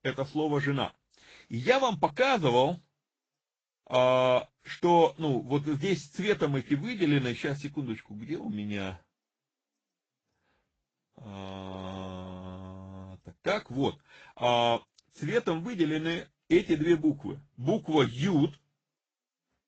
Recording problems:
high frequencies cut off; noticeable; nothing above 7.5 kHz
garbled, watery; slightly

